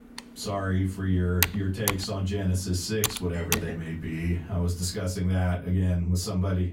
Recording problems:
off-mic speech; far
room echo; very slight; dies away in 0.2 s
keyboard typing; loud; until 3.5 s; peak 2 dB above the speech

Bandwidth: 16 kHz